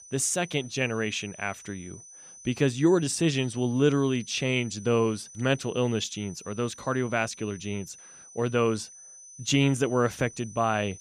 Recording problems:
high-pitched whine; noticeable; throughout; 6 kHz, 20 dB below the speech

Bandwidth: 15 kHz